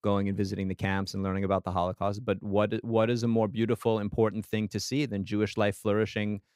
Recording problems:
none

